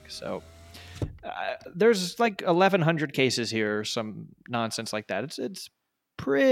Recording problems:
traffic noise; noticeable; throughout; 15 dB below the speech
abrupt cut into speech; at the end

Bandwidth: 16.5 kHz